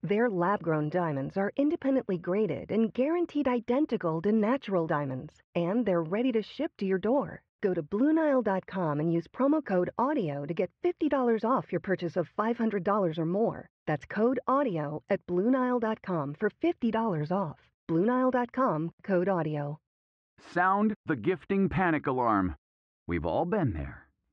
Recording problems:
muffled; very; fading above 2 kHz

